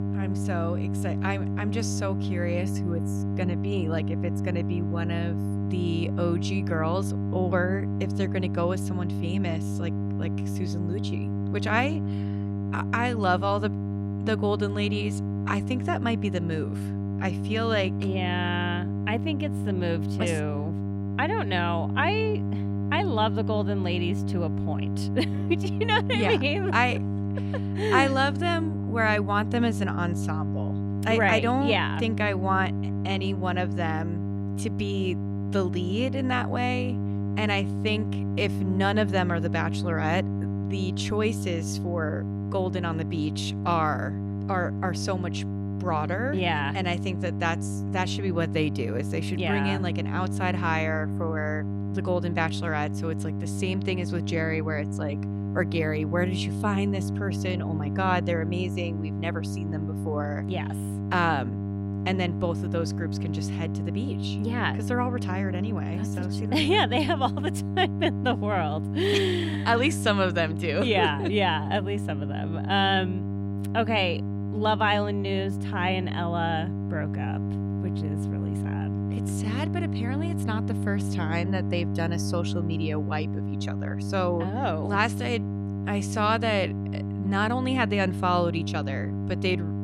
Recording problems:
electrical hum; loud; throughout; 50 Hz, 10 dB below the speech

